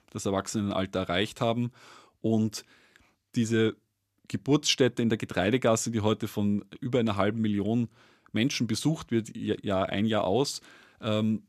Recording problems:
none

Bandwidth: 14.5 kHz